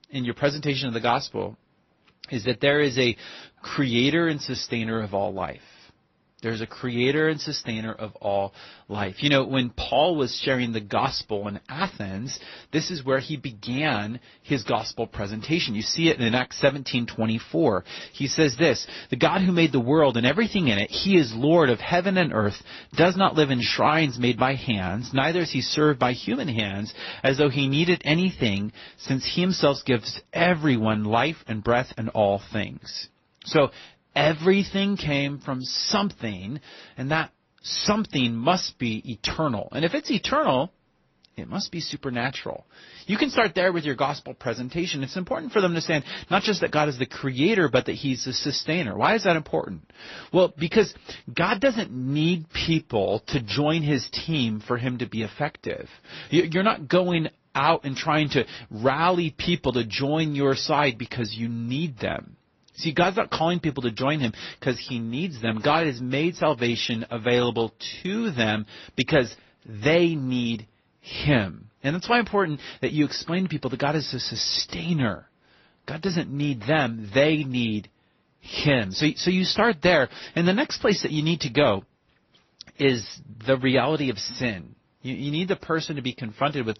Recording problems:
garbled, watery; slightly; nothing above 6 kHz

